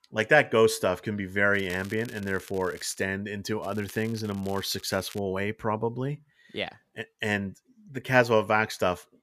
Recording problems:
crackling; faint; from 1.5 to 3 s and from 3.5 to 5 s; 20 dB below the speech

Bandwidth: 14.5 kHz